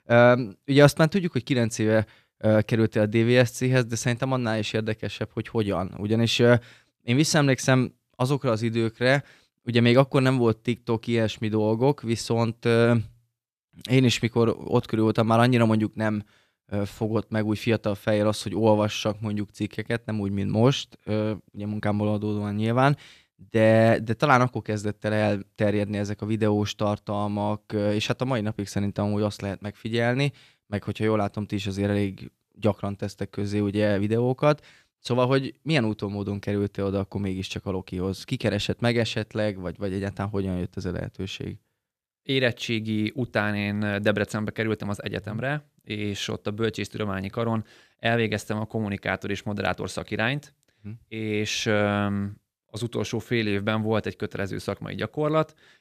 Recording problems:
none

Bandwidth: 14.5 kHz